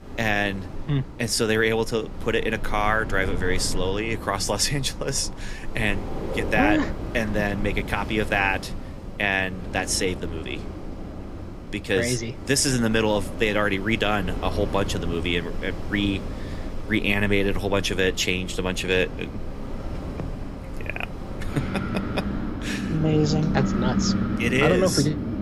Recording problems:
wind in the background; loud; throughout; 8 dB below the speech

